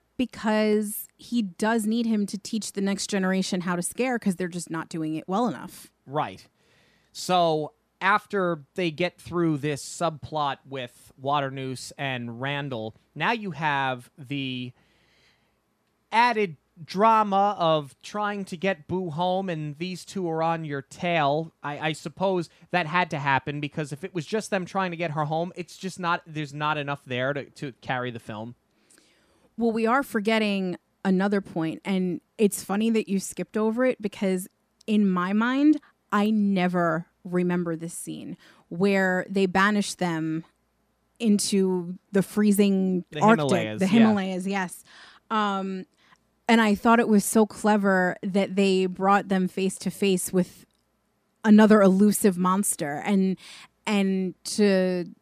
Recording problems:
none

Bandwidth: 14.5 kHz